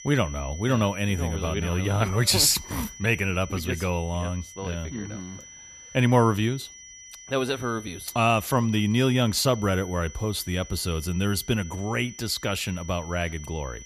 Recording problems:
high-pitched whine; noticeable; throughout; 6 kHz, 15 dB below the speech

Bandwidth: 14.5 kHz